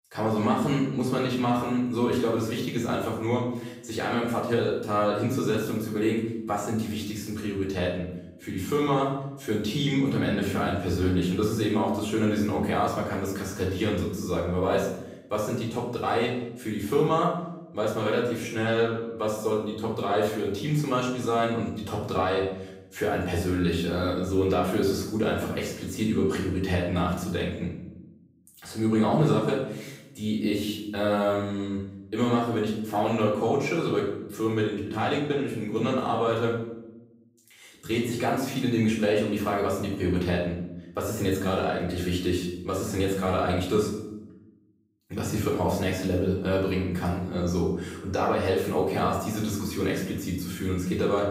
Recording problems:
off-mic speech; far
room echo; noticeable; dies away in 0.8 s

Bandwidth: 15.5 kHz